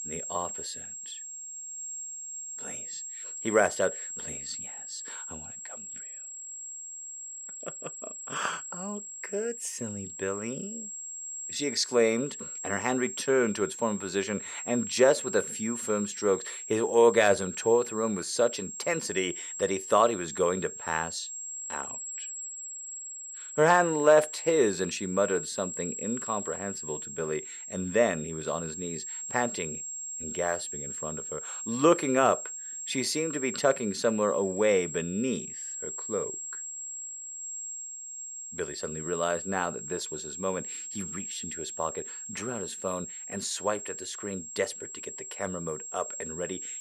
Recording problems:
high-pitched whine; loud; throughout; 7.5 kHz, 7 dB below the speech

